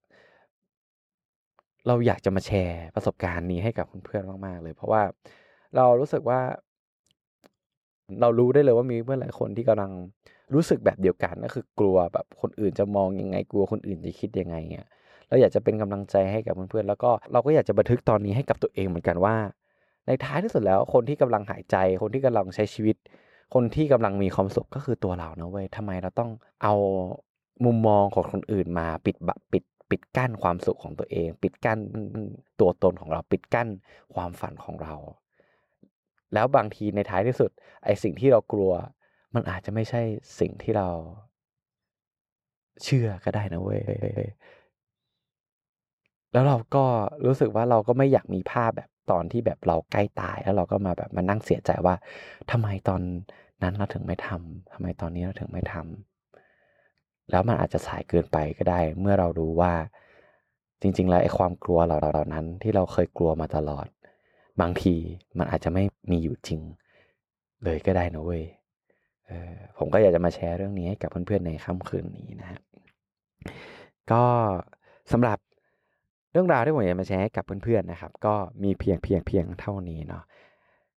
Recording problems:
muffled; very; fading above 2.5 kHz
audio stuttering; 4 times, first at 32 s

